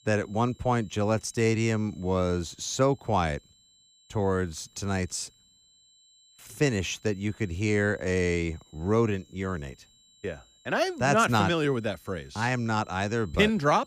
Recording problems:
high-pitched whine; faint; throughout; 4 kHz, 30 dB below the speech

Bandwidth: 15 kHz